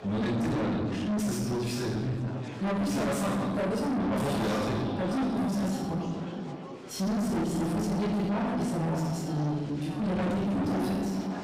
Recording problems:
distortion; heavy; 5 dB below the speech
off-mic speech; far
echo of what is said; noticeable; from 4 s on; 560 ms later, 15 dB below the speech
room echo; noticeable; dies away in 1 s
chatter from many people; noticeable; throughout; 15 dB below the speech

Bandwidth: 15.5 kHz